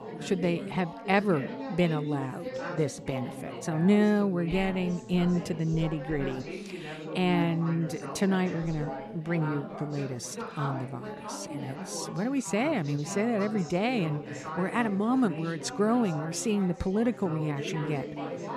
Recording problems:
background chatter; loud; throughout; 4 voices, 9 dB below the speech

